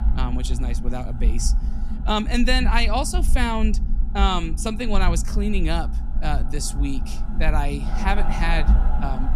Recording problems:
machinery noise; noticeable; throughout; 15 dB below the speech
low rumble; noticeable; throughout; 15 dB below the speech

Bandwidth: 14 kHz